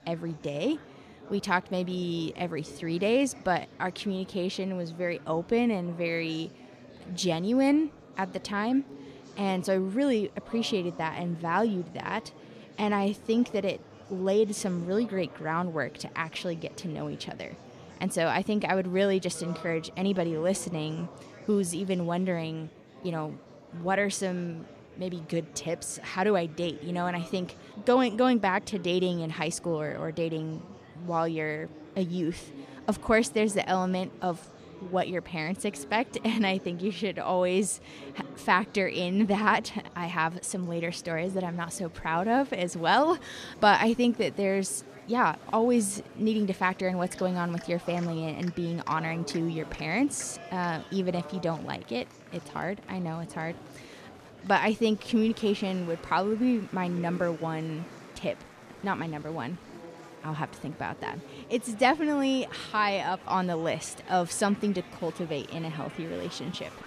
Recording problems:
murmuring crowd; noticeable; throughout; 20 dB below the speech

